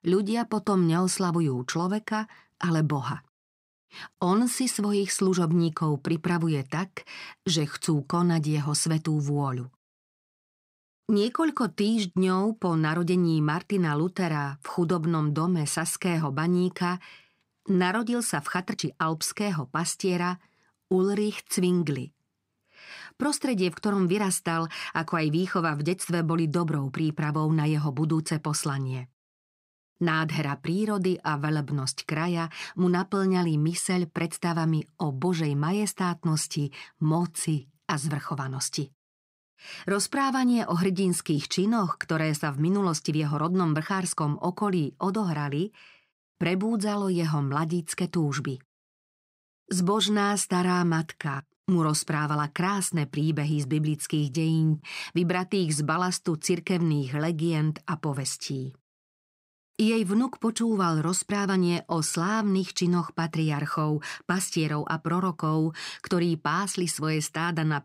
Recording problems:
uneven, jittery; strongly; from 18 s to 1:02

